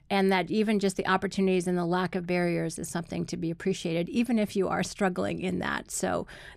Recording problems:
none

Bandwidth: 14.5 kHz